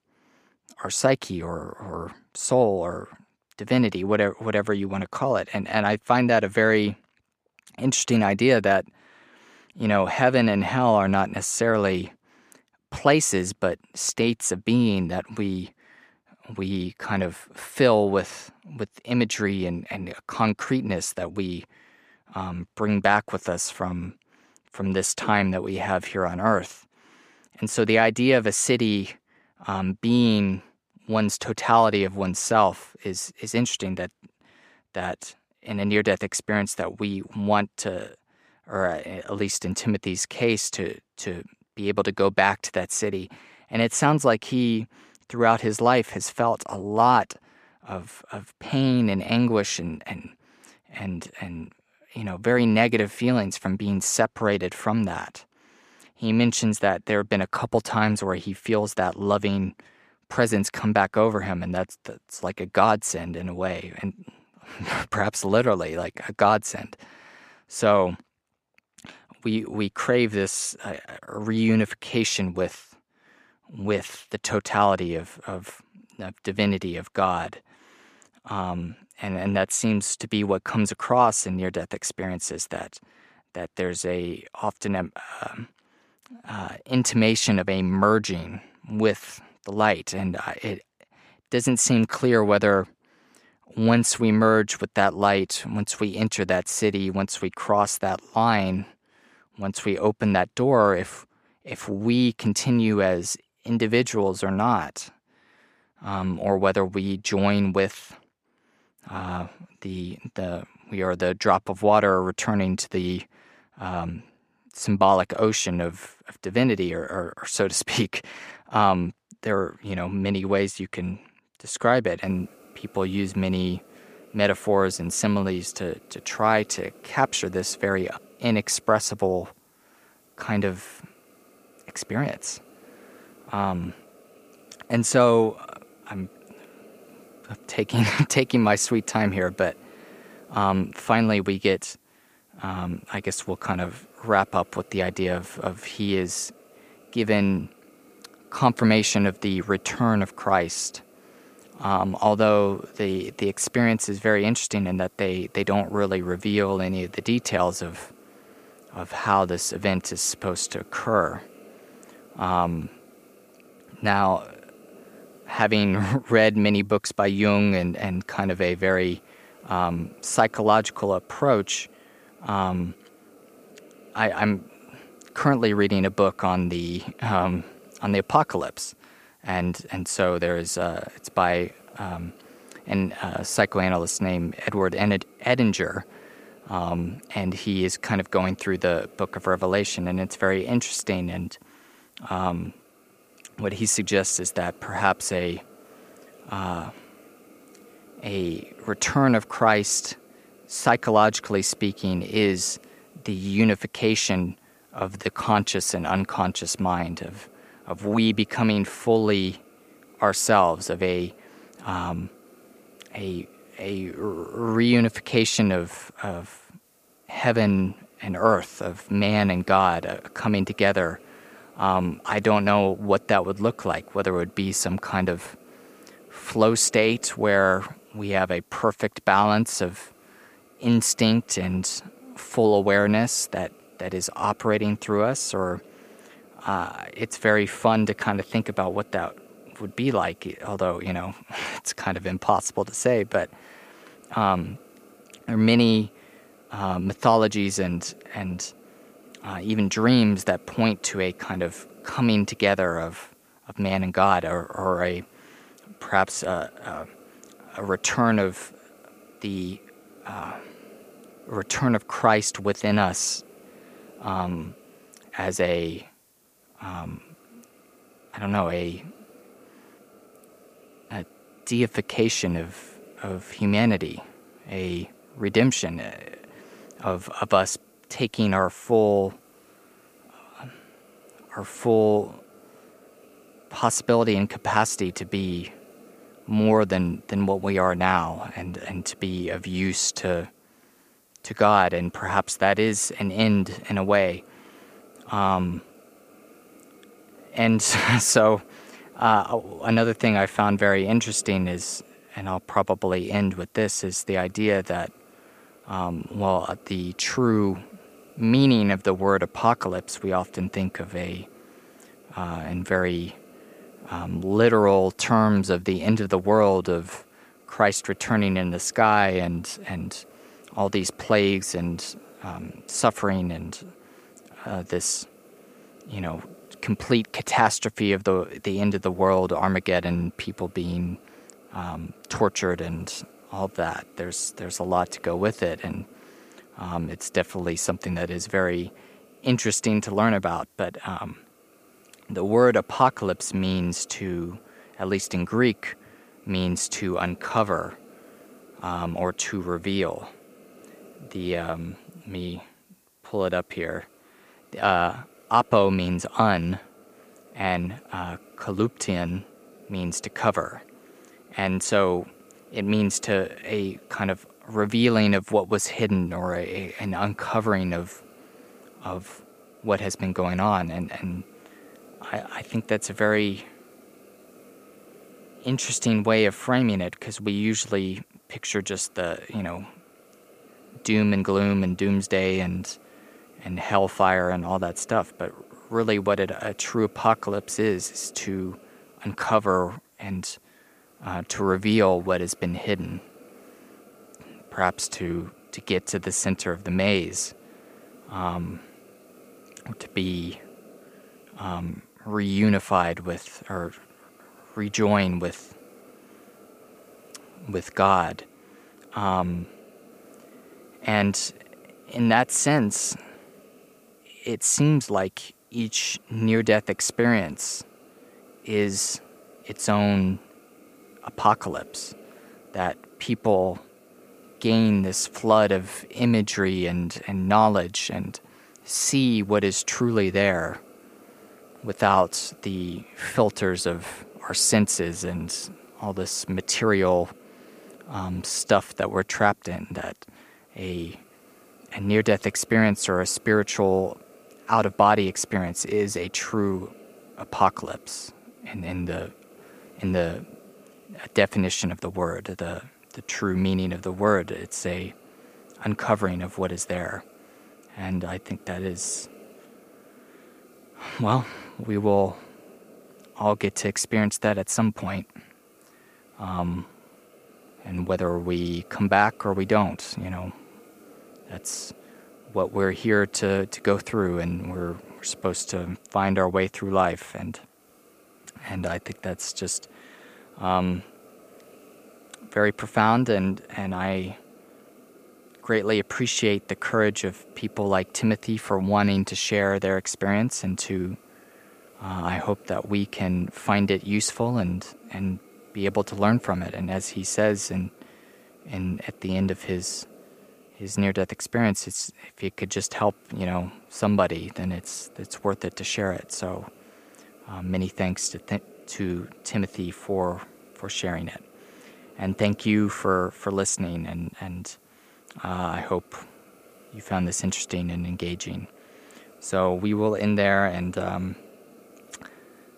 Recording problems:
hiss; faint; from 2:02 on; 30 dB below the speech

